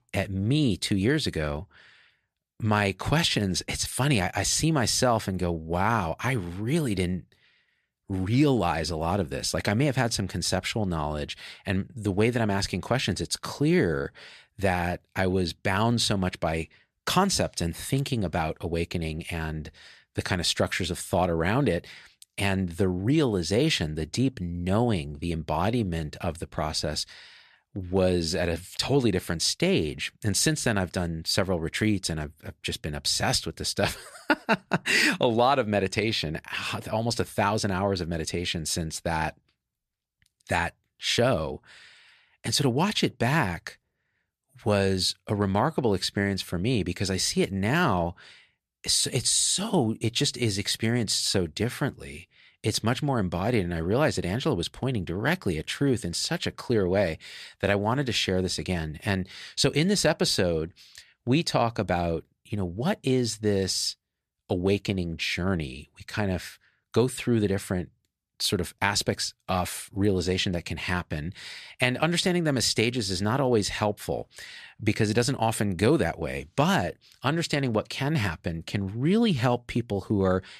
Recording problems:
none

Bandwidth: 14 kHz